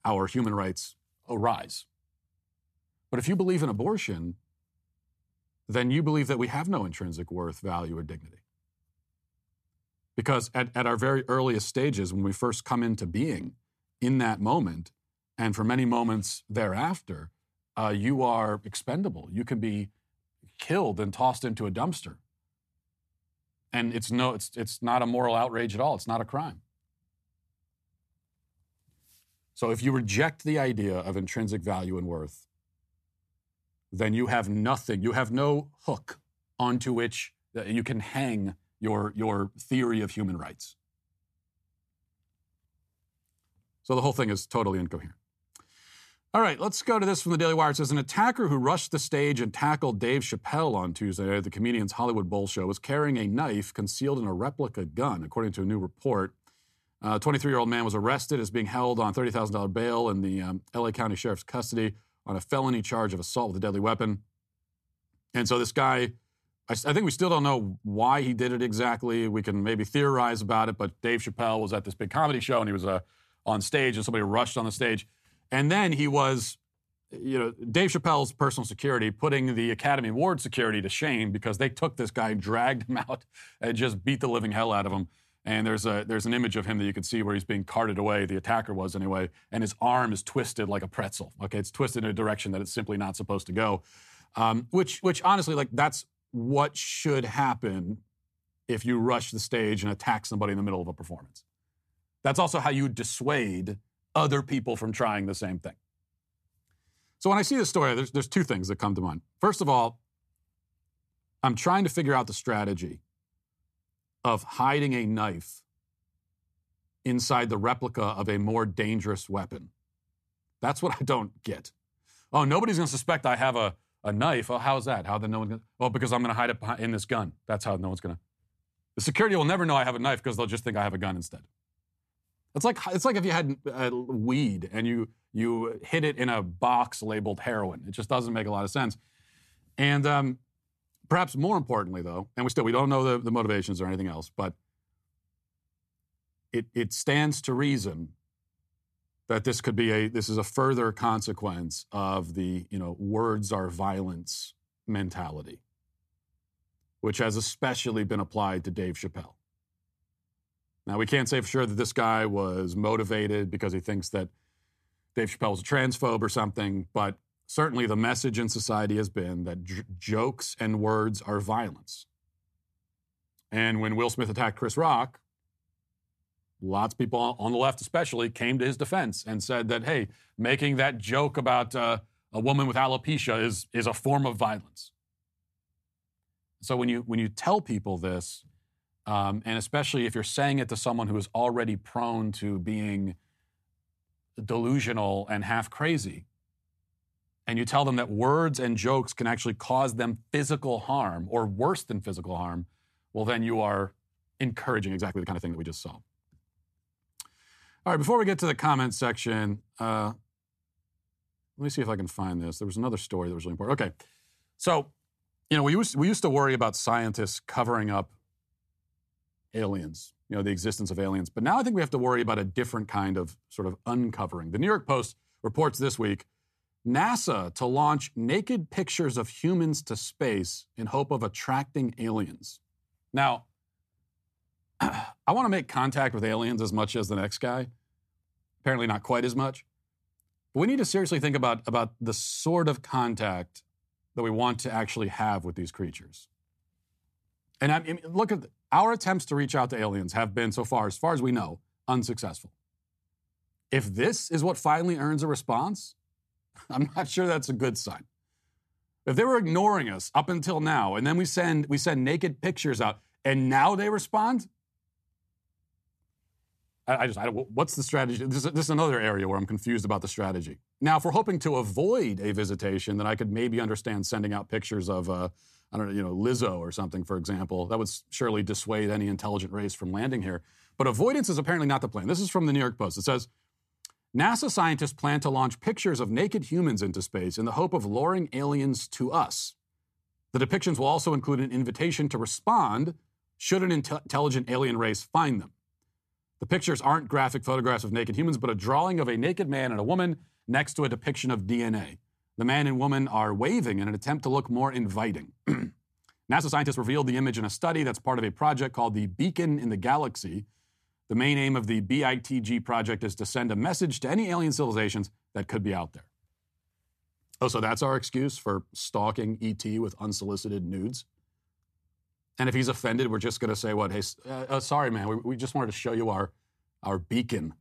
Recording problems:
uneven, jittery; strongly; from 2:22 to 5:07

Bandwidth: 14 kHz